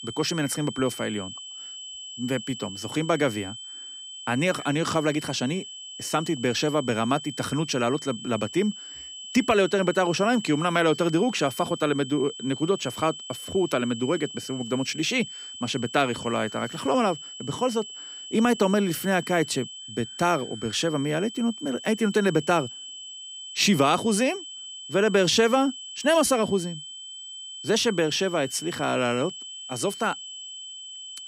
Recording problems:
high-pitched whine; noticeable; throughout; 3 kHz, 10 dB below the speech

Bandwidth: 15.5 kHz